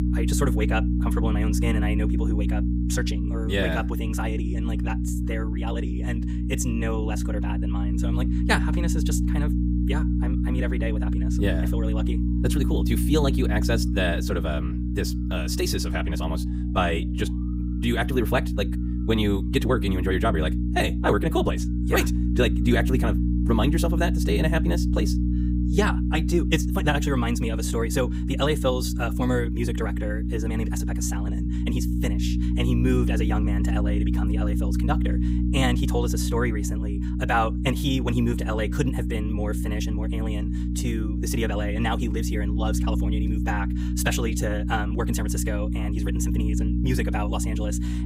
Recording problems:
wrong speed, natural pitch; too fast; 1.5 times normal speed
electrical hum; loud; throughout; 60 Hz, 6 dB below the speech

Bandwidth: 15.5 kHz